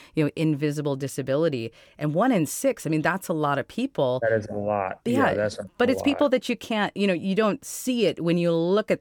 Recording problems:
none

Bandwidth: 18.5 kHz